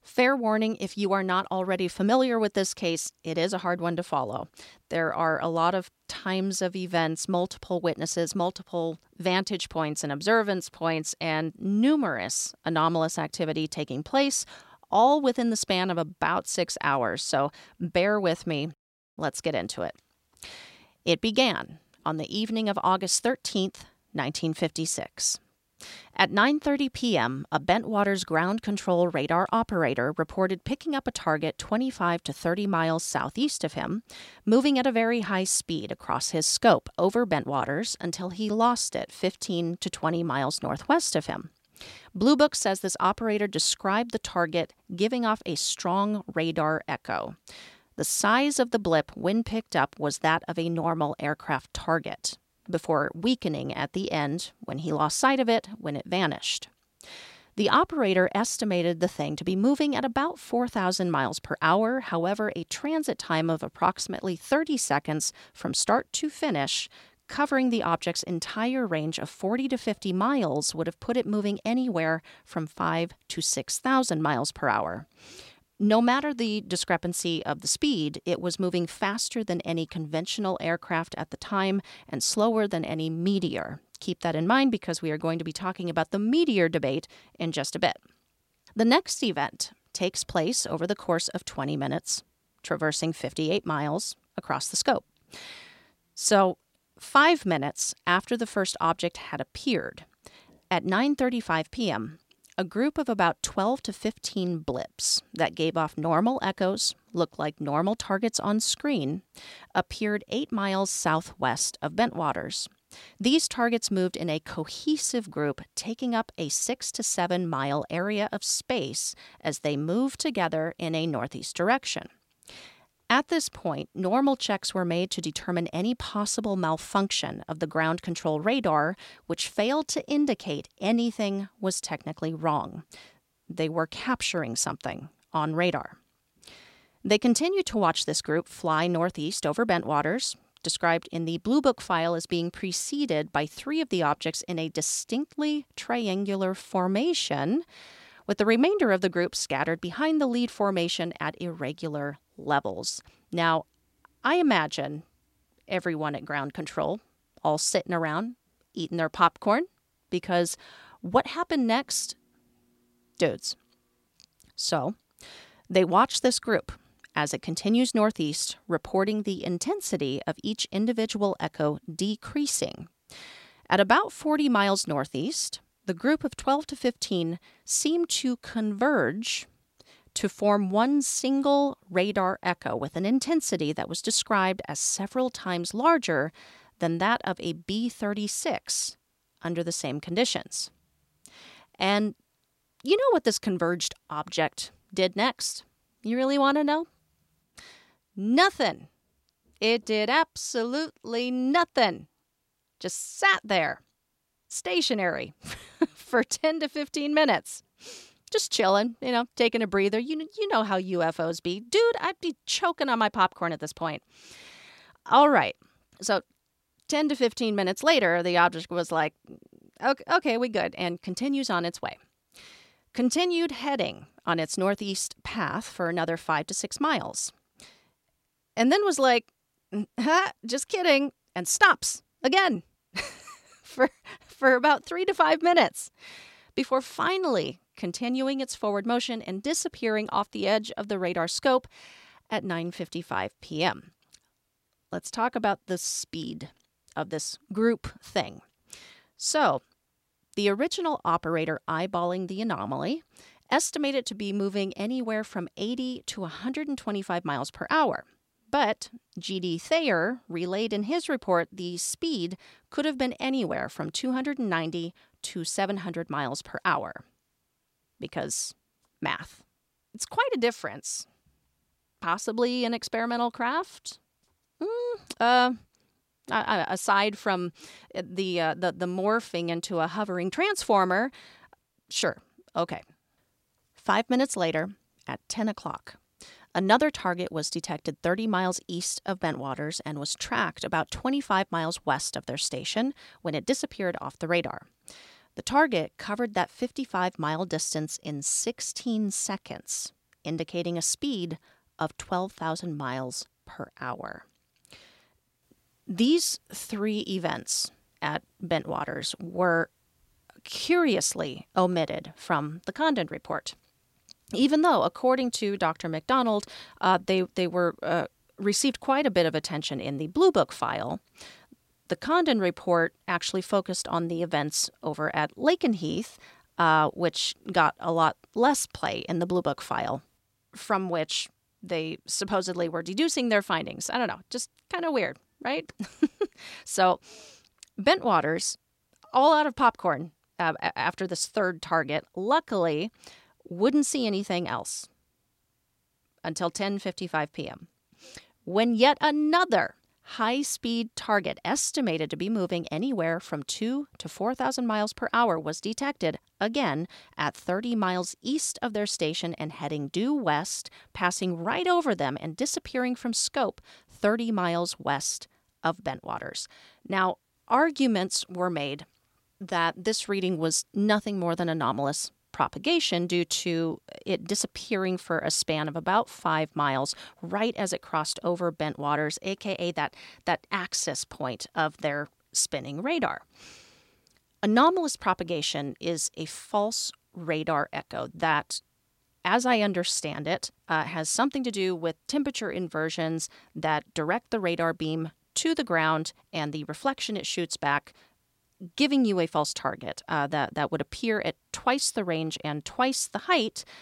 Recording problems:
none

